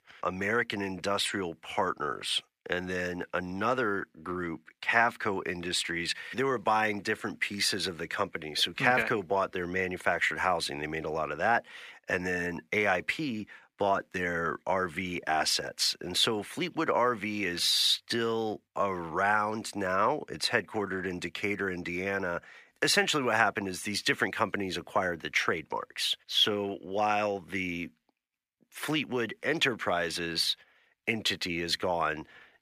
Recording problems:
thin; somewhat; fading below 600 Hz

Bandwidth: 15 kHz